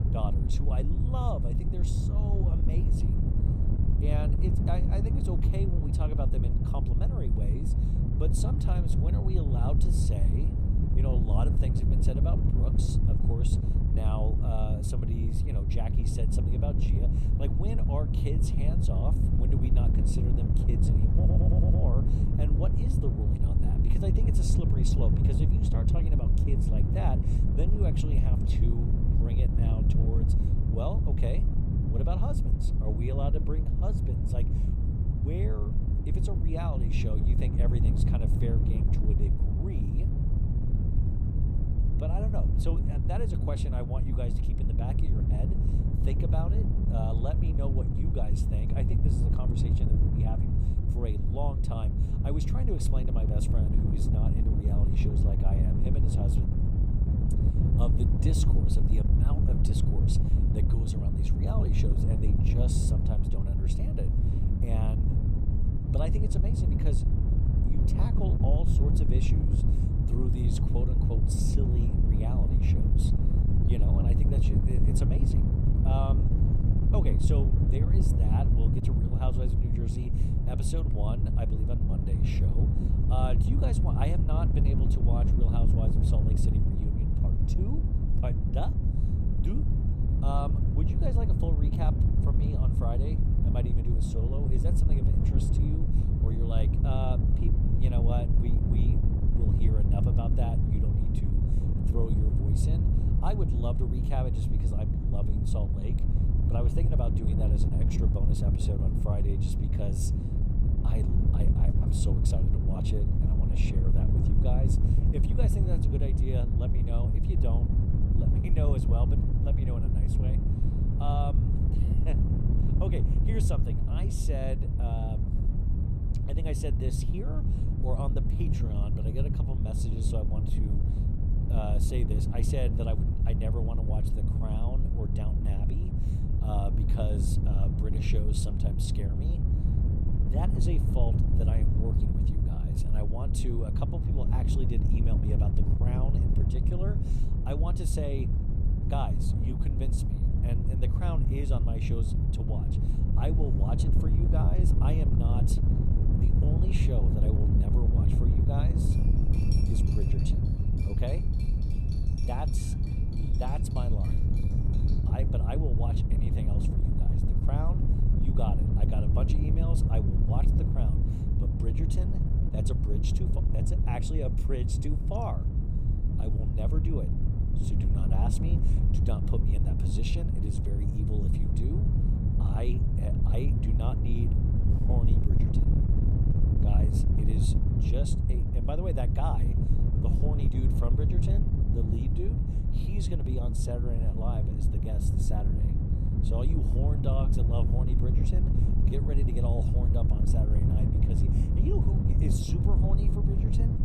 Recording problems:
wind noise on the microphone; heavy; 1 dB above the speech
audio stuttering; at 21 s
clattering dishes; noticeable; from 2:39 to 2:45; peak 6 dB below the speech

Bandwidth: 15.5 kHz